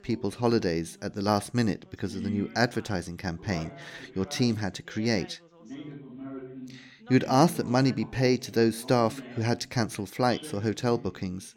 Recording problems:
background chatter; noticeable; throughout; 2 voices, 15 dB below the speech

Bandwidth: 18 kHz